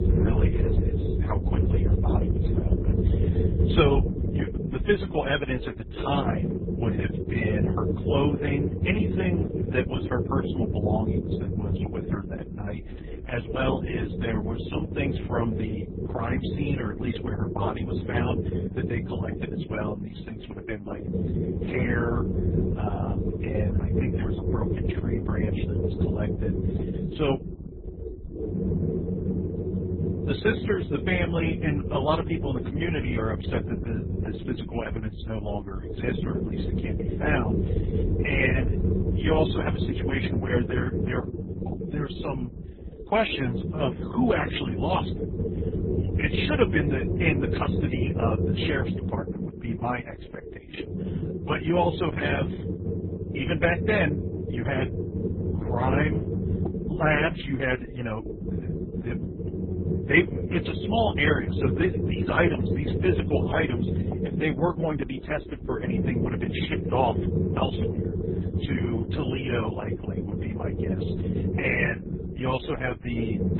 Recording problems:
garbled, watery; badly; nothing above 3.5 kHz
low rumble; loud; throughout; 5 dB below the speech

